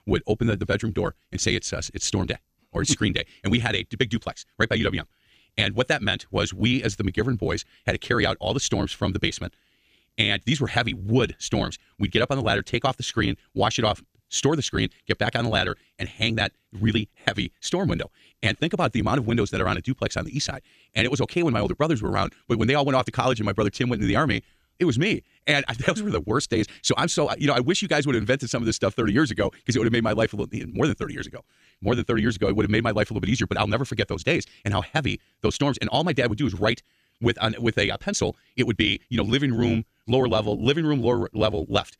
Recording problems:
wrong speed, natural pitch; too fast; 1.7 times normal speed

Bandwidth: 14.5 kHz